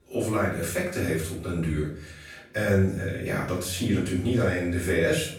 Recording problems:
off-mic speech; far
room echo; noticeable; dies away in 0.5 s
background chatter; faint; throughout; 4 voices, 30 dB below the speech

